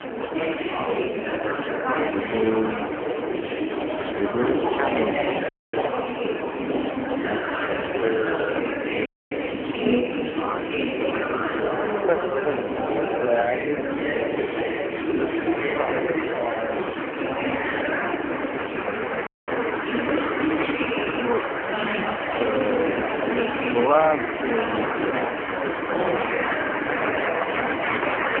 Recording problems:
phone-call audio; poor line
wrong speed, natural pitch; too slow; 0.5 times normal speed
murmuring crowd; very loud; throughout; 2 dB above the speech
household noises; loud; throughout; 8 dB below the speech
audio cutting out; at 5.5 s, at 9 s and at 19 s

